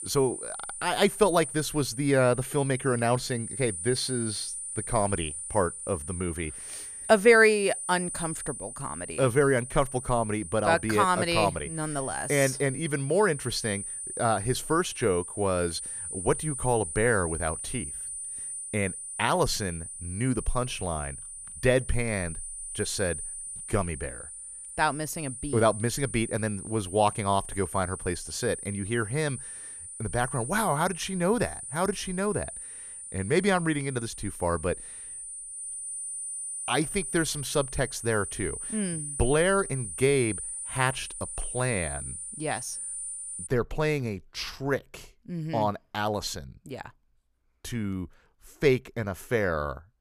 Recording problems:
high-pitched whine; loud; until 43 s; 9.5 kHz, 8 dB below the speech

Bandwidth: 14.5 kHz